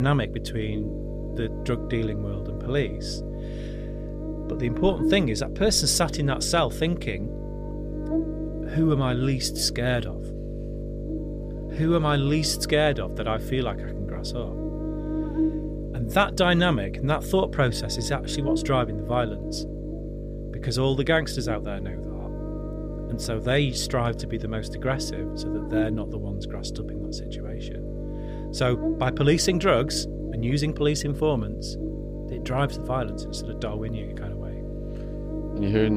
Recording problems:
electrical hum; noticeable; throughout; 50 Hz, 10 dB below the speech
abrupt cut into speech; at the start and the end

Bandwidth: 15 kHz